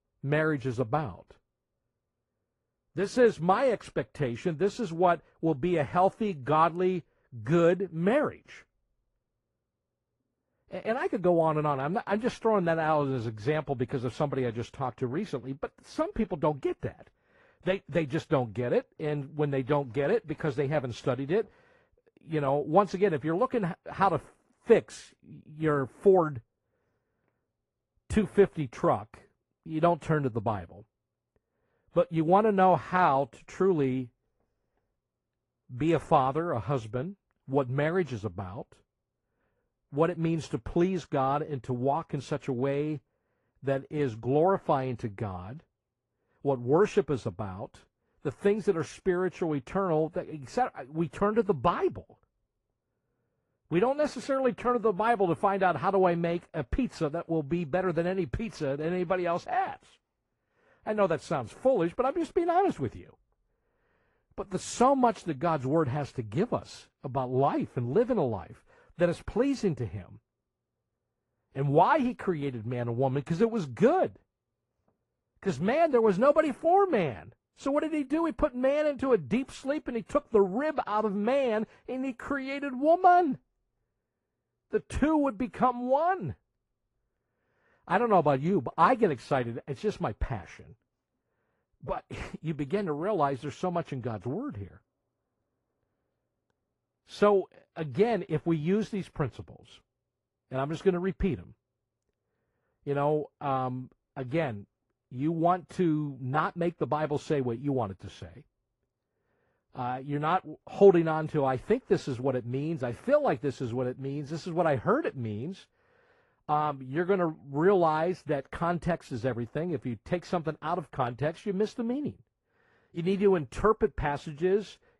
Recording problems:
muffled; slightly; fading above 2 kHz
garbled, watery; slightly; nothing above 11 kHz

